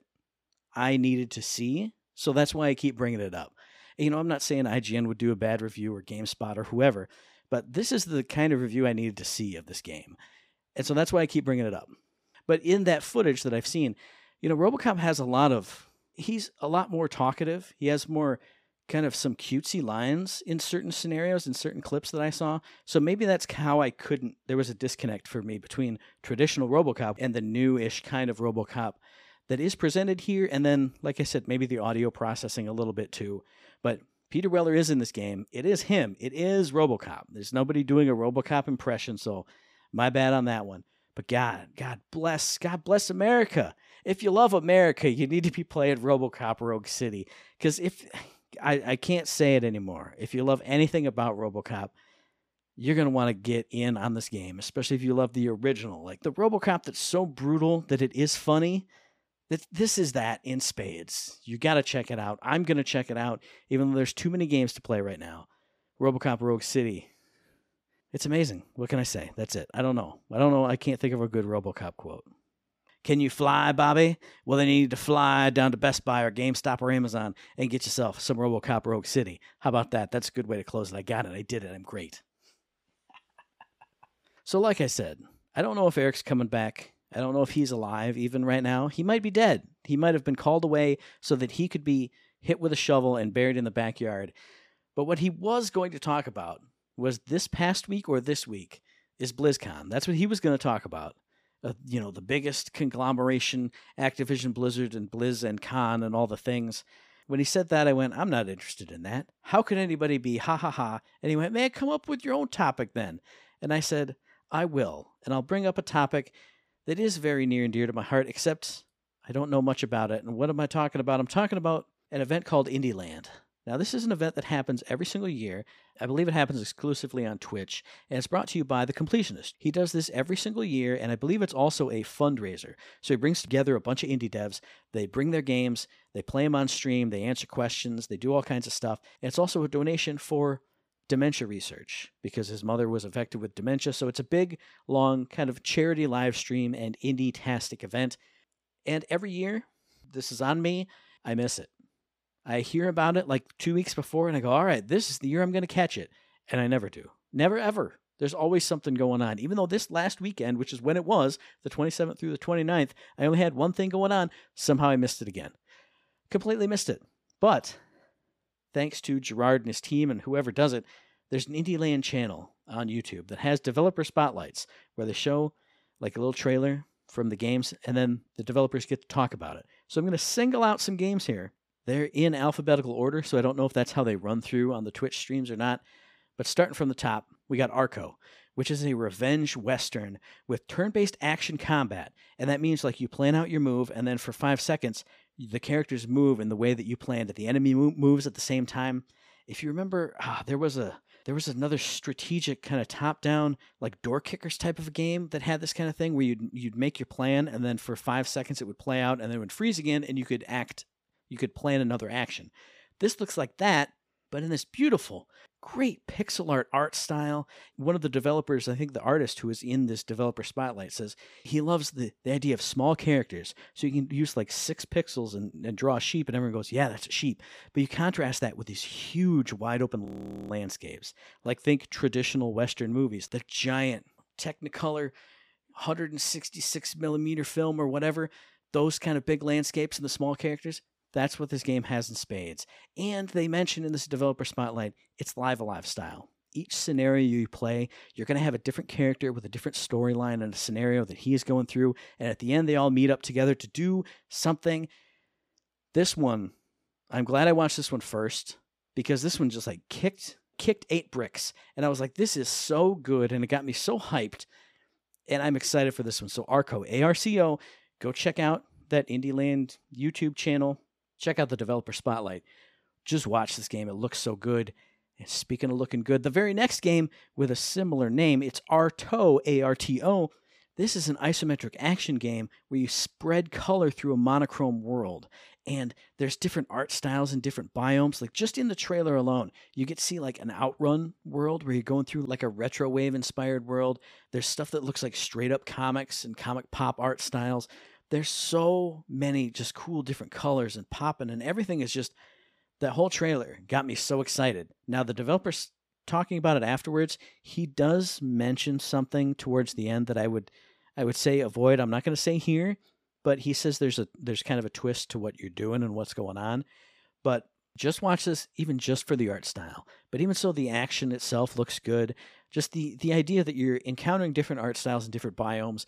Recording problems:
audio freezing; at 3:50

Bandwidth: 15 kHz